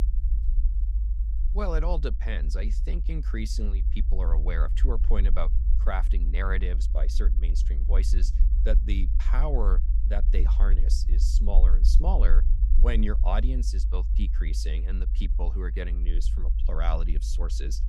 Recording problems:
low rumble; noticeable; throughout; 10 dB below the speech

